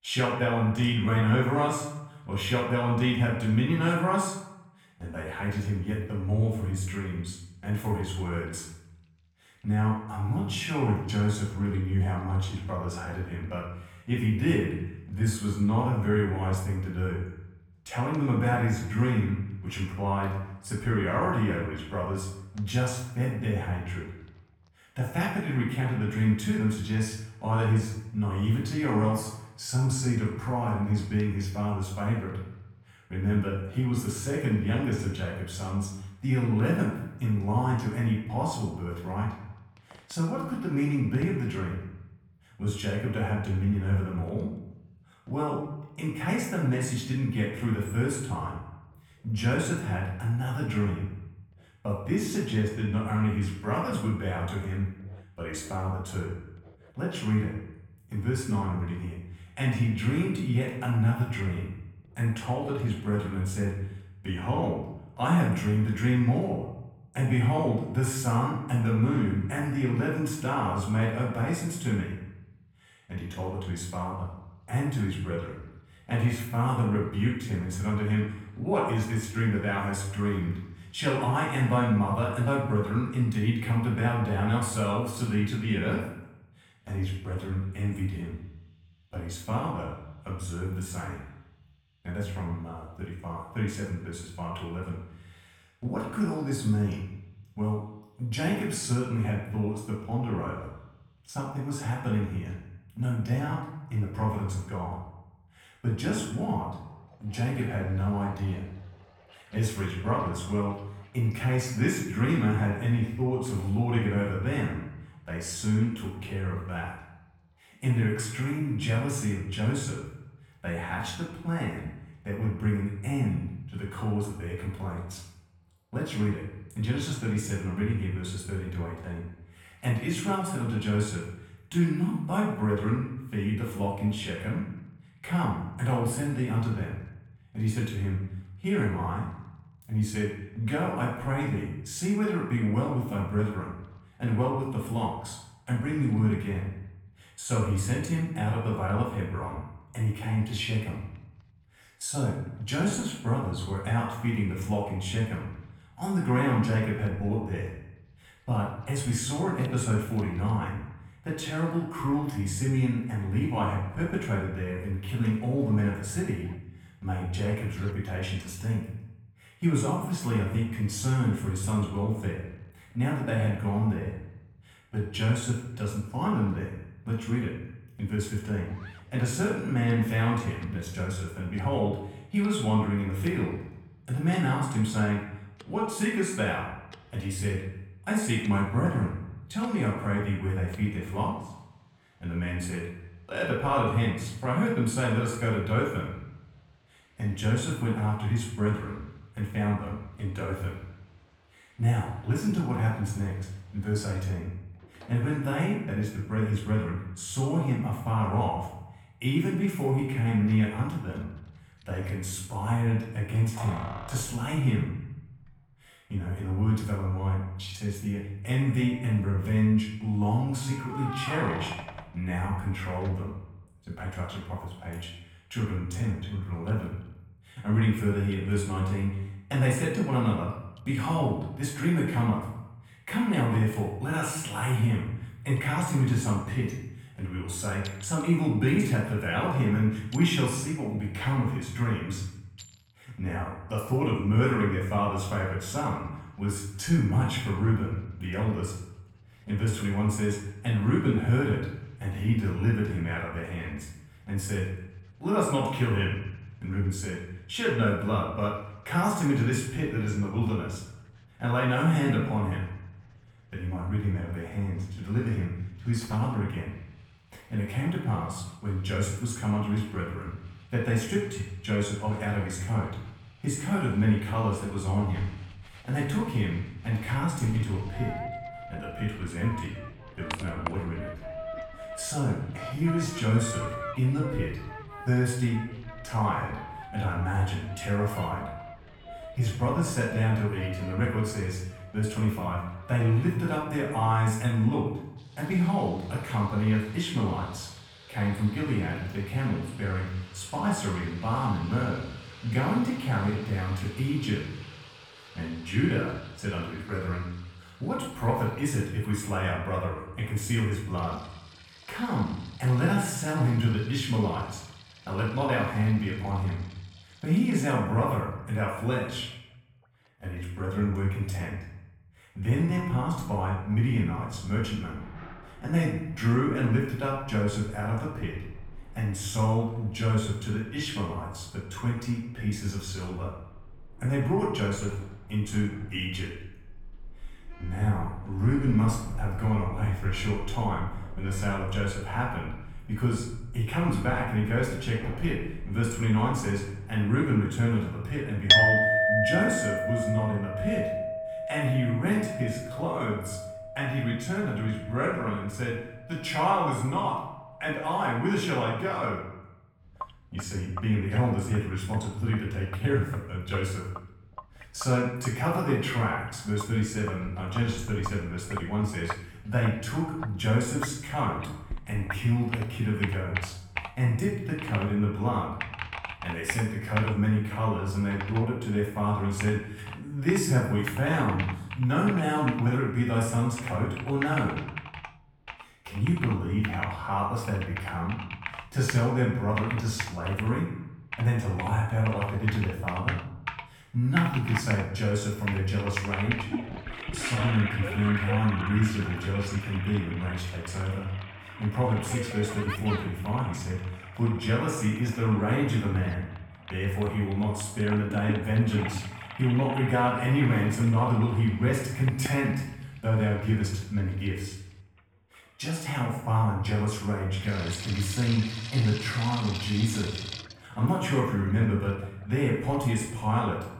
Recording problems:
off-mic speech; far
room echo; noticeable; dies away in 0.8 s
household noises; loud; throughout; 8 dB below the speech

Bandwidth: 18.5 kHz